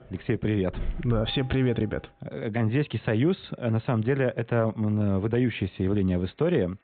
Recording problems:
high frequencies cut off; severe; nothing above 4 kHz
alarms or sirens; noticeable; throughout; 15 dB below the speech

